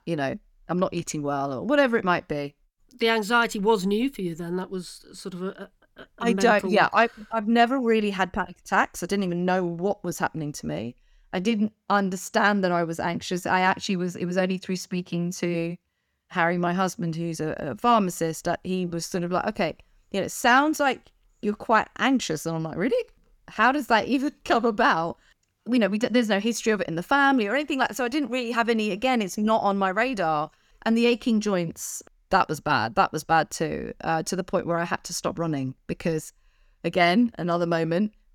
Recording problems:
none

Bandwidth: 18 kHz